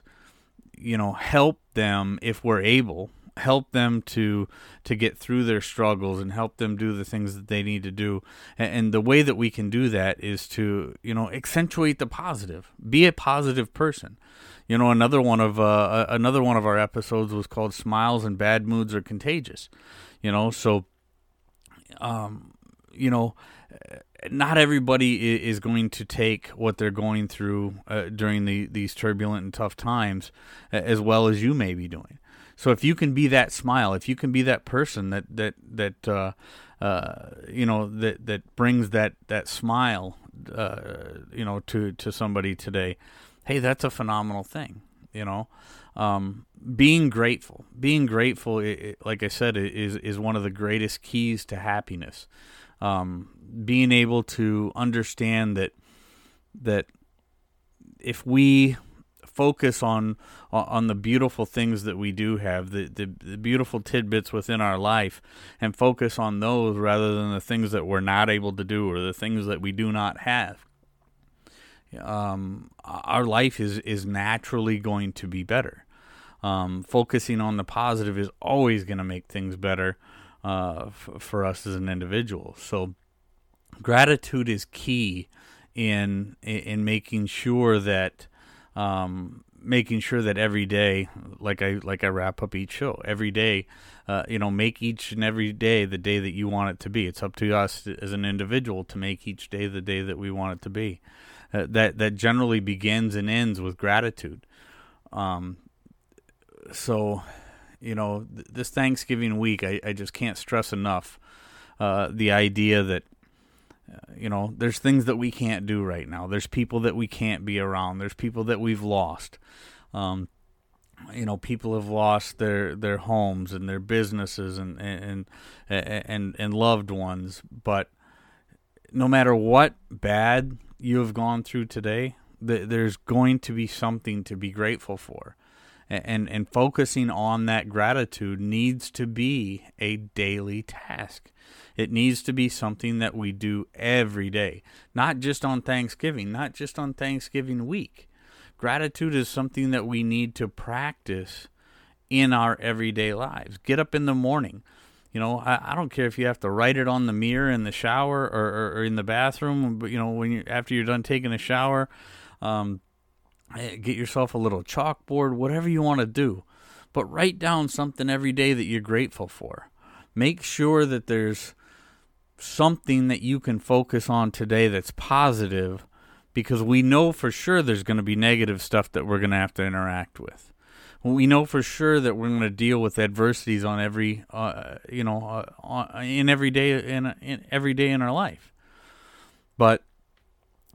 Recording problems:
none

